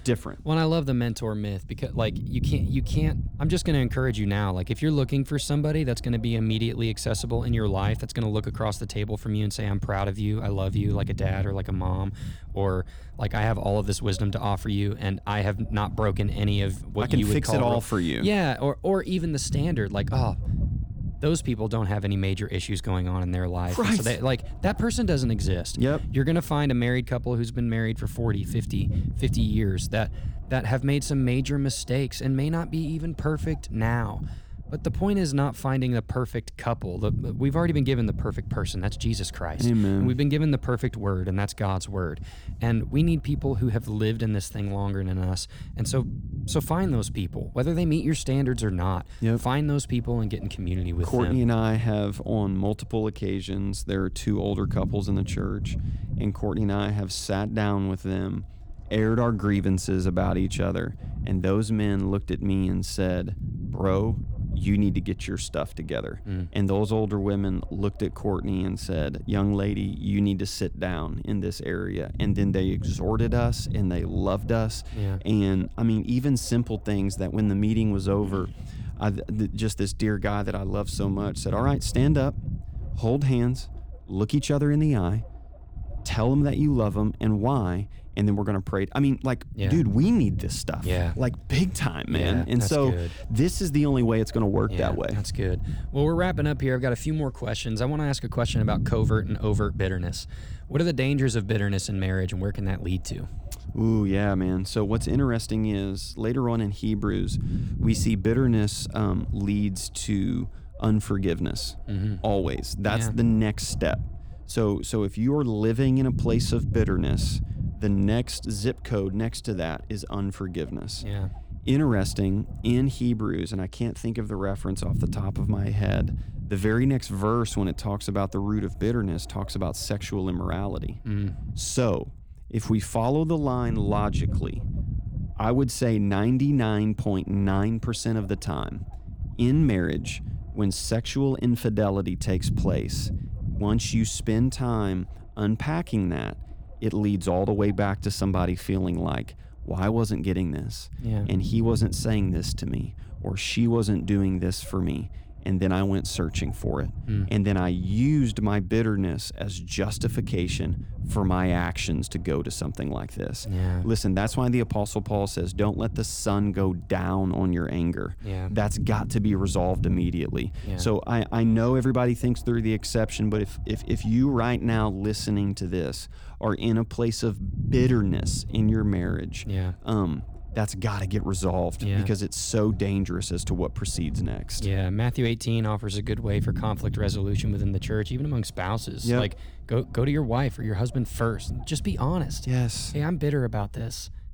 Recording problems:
low rumble; noticeable; throughout; 15 dB below the speech

